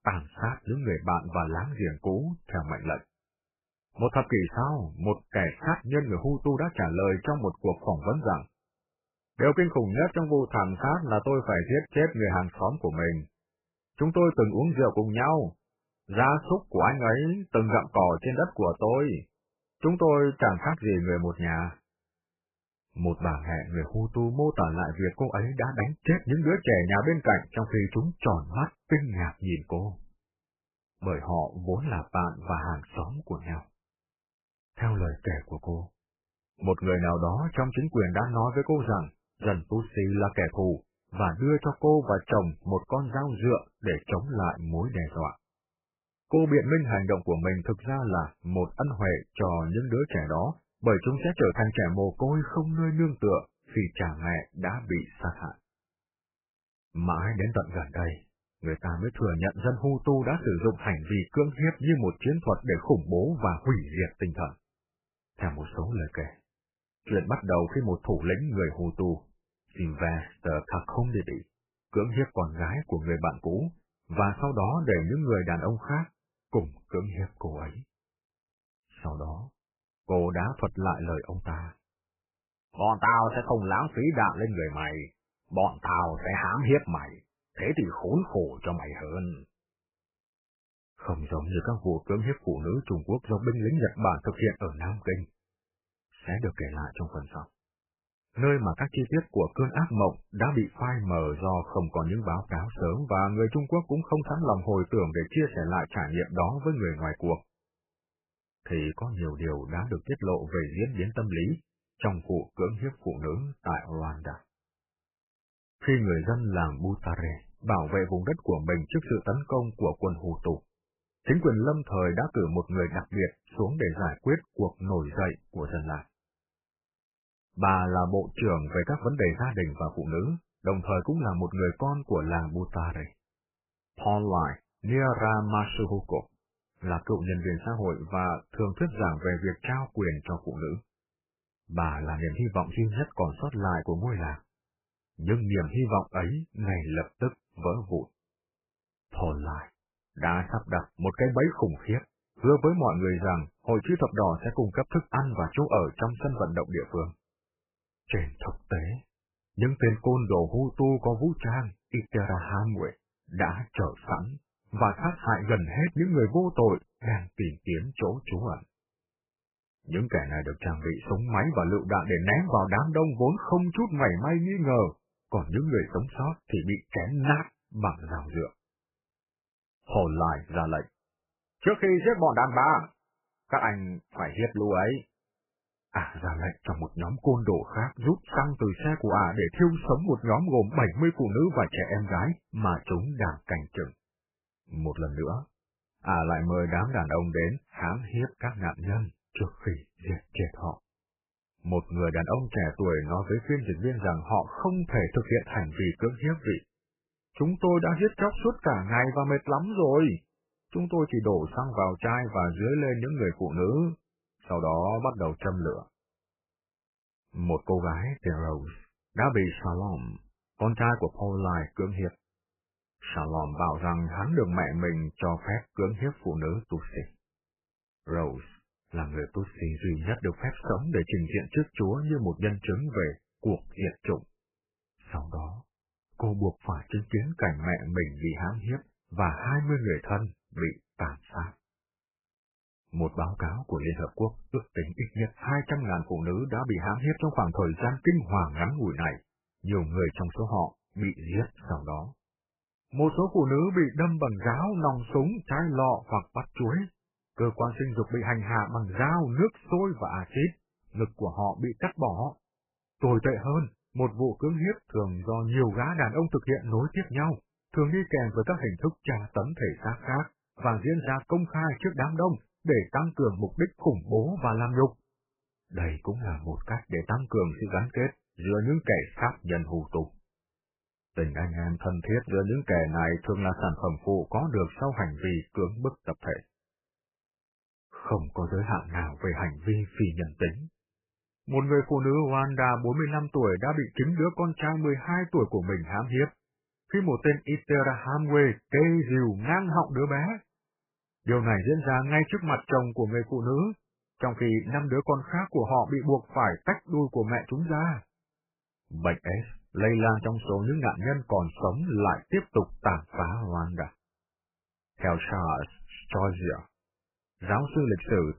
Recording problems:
garbled, watery; badly; nothing above 3 kHz

